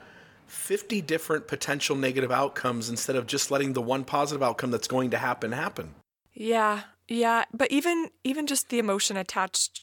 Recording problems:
none

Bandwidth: 17.5 kHz